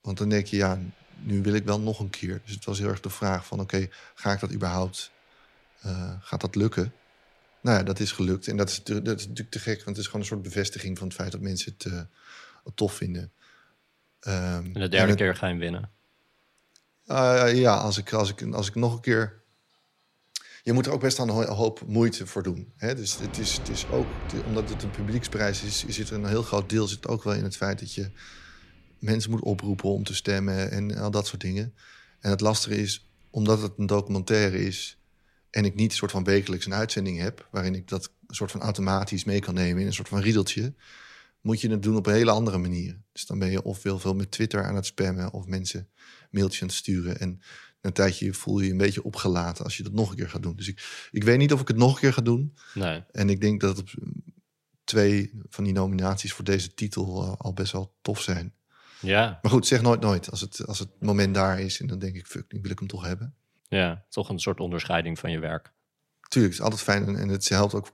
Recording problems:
household noises; noticeable; until 49 s; 15 dB below the speech

